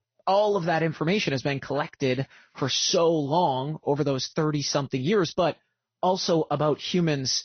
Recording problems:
high frequencies cut off; noticeable; nothing above 6 kHz
garbled, watery; slightly

